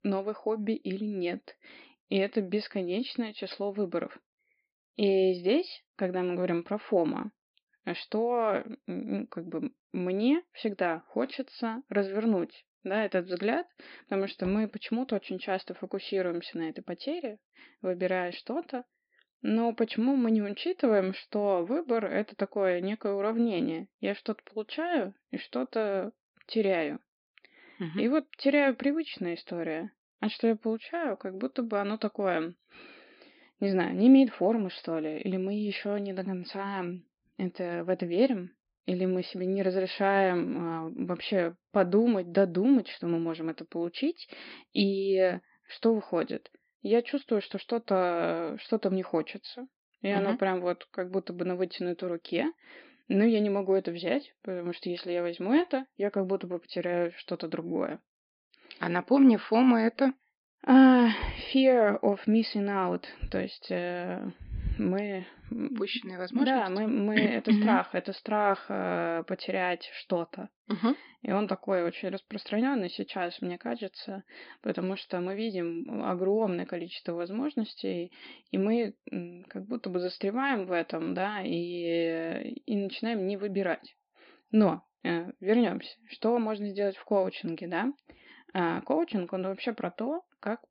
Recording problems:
high frequencies cut off; noticeable; nothing above 5 kHz

